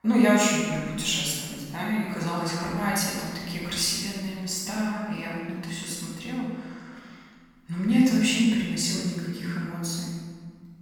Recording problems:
room echo; strong; dies away in 1.7 s
off-mic speech; far

